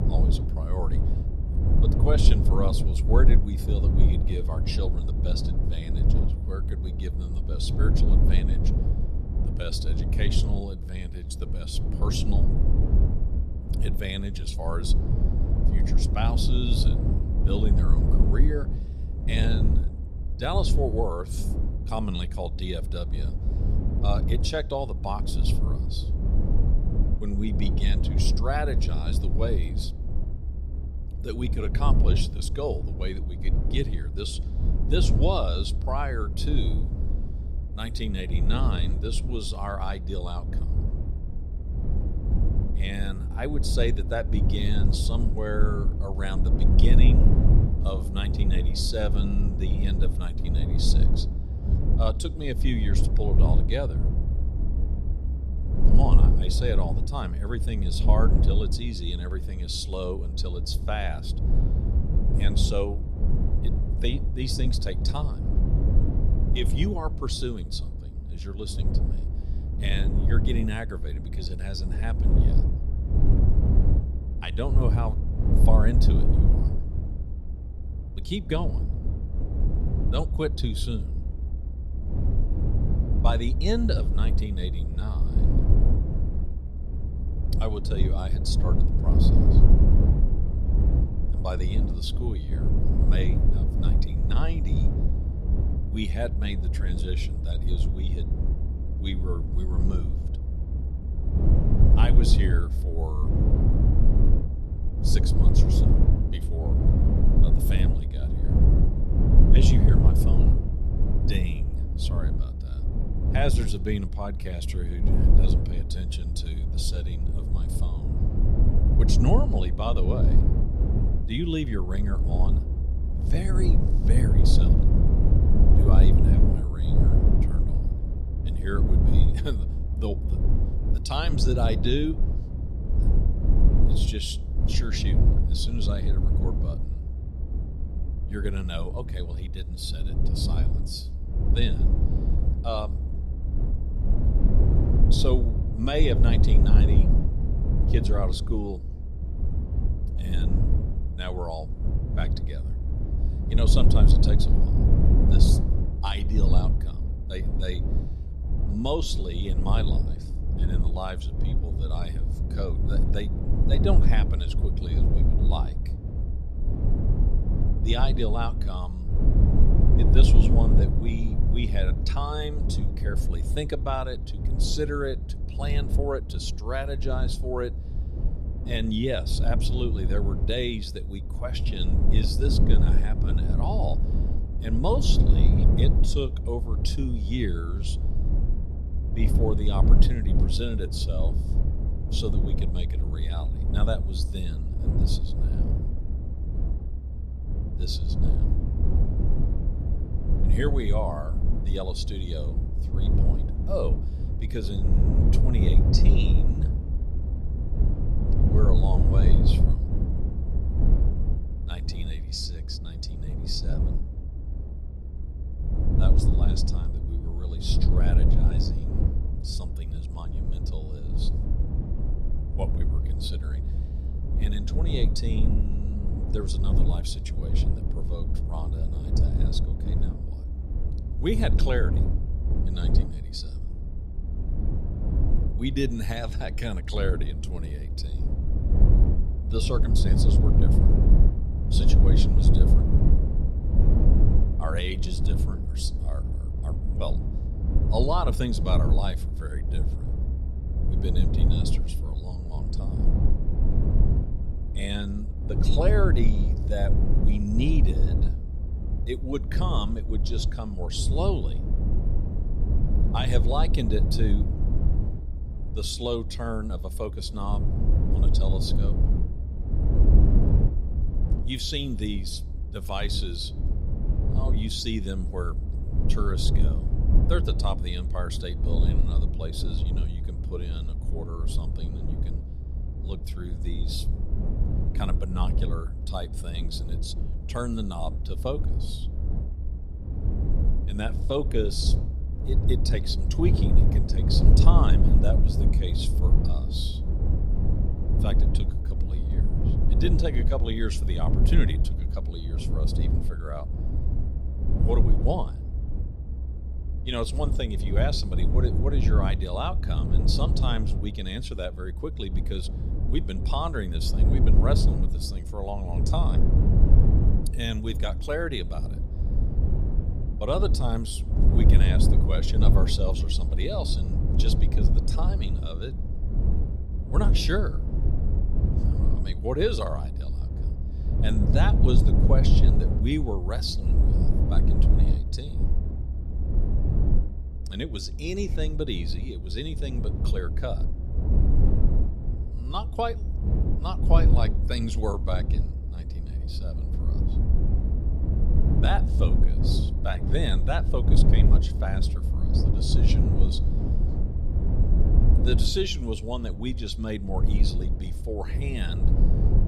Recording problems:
low rumble; loud; throughout; 5 dB below the speech

